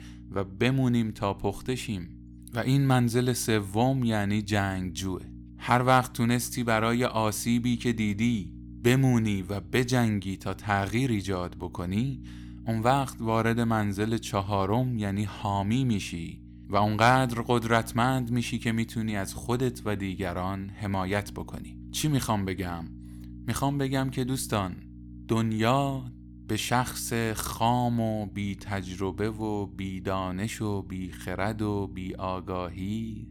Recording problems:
electrical hum; faint; throughout; 60 Hz, 25 dB below the speech

